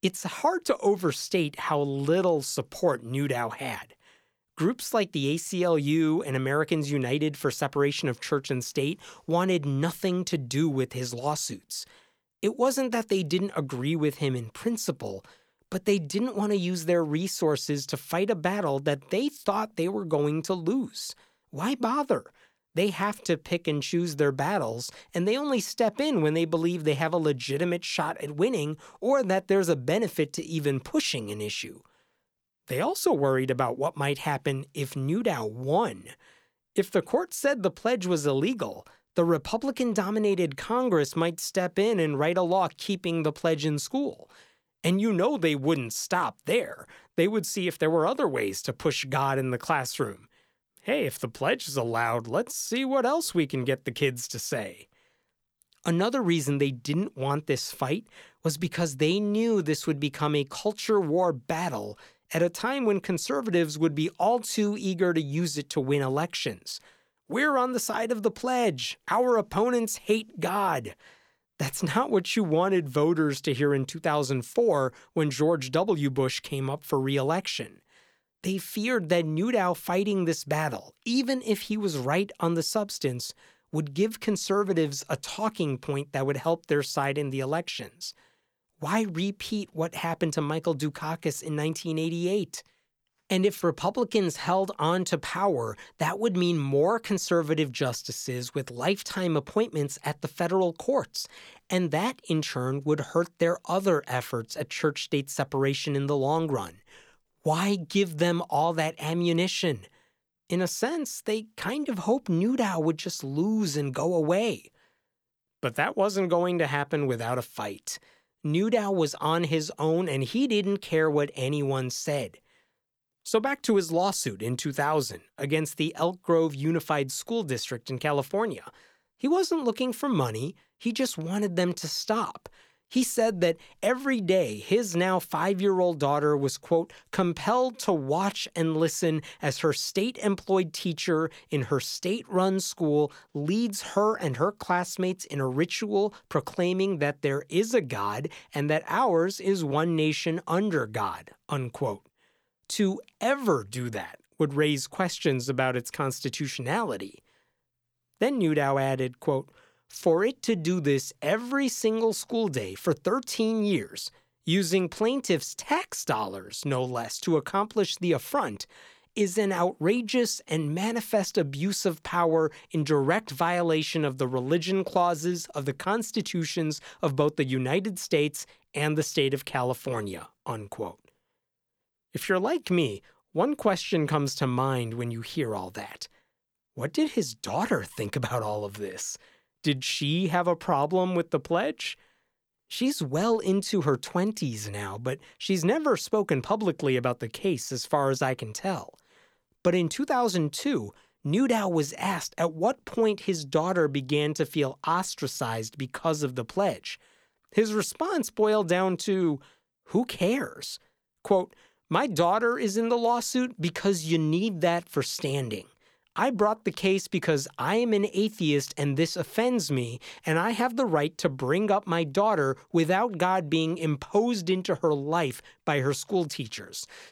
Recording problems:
none

